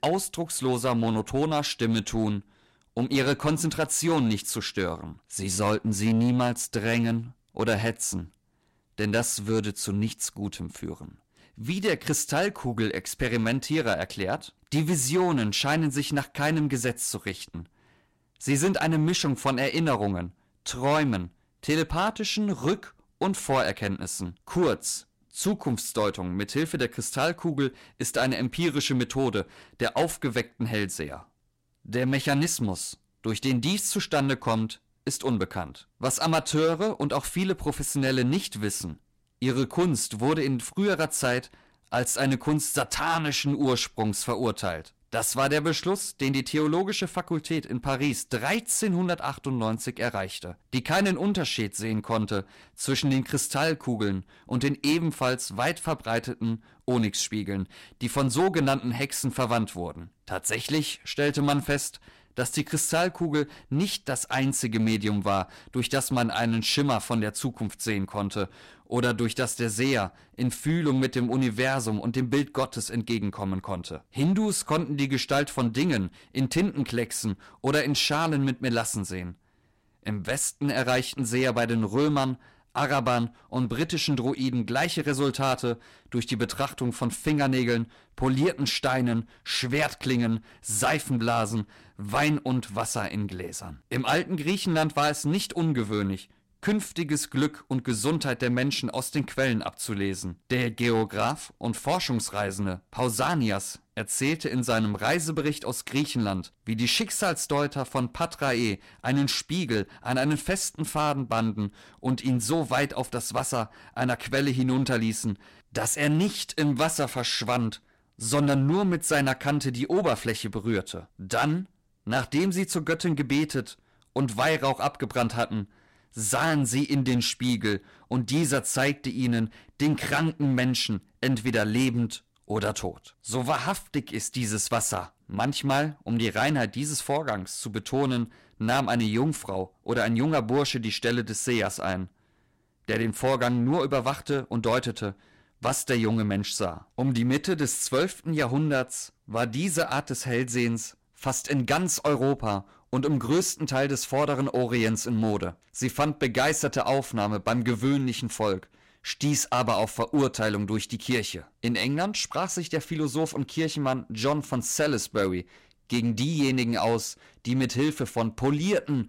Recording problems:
distortion; slight; 4% of the sound clipped

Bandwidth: 16 kHz